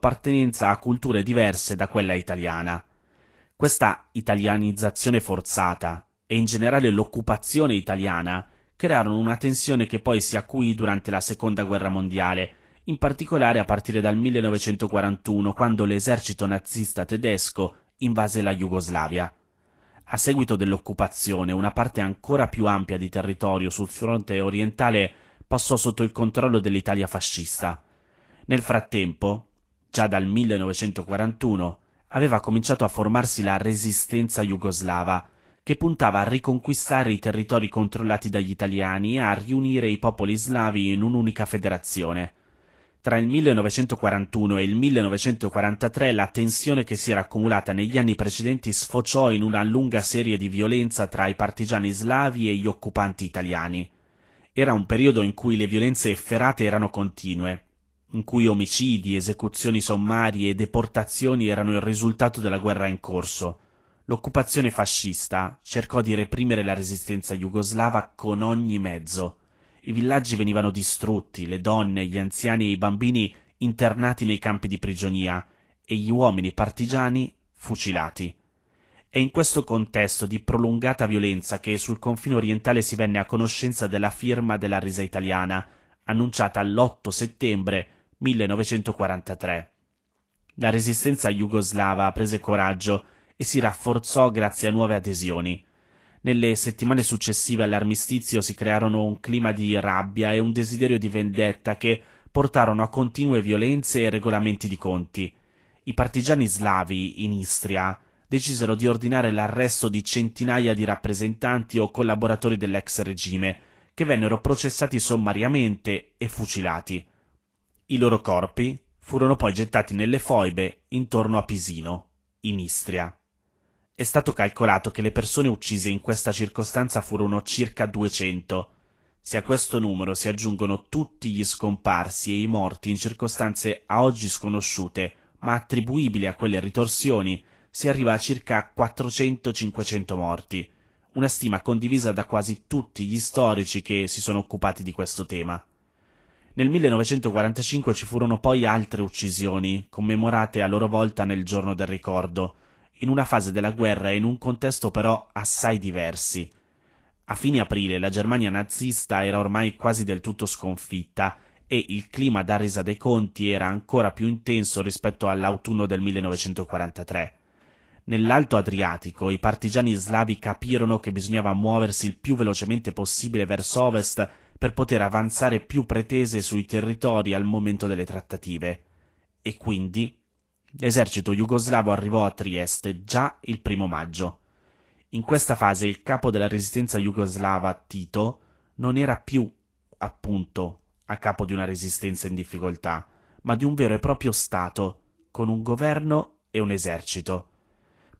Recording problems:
garbled, watery; slightly; nothing above 16.5 kHz

